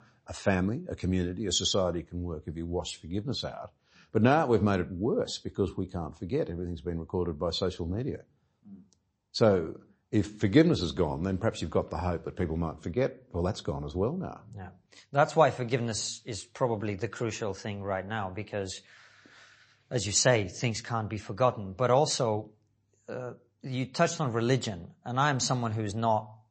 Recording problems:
garbled, watery; slightly; nothing above 7.5 kHz

